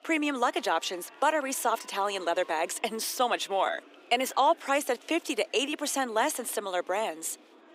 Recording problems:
thin; somewhat; fading below 300 Hz
murmuring crowd; faint; throughout; 25 dB below the speech

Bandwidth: 15.5 kHz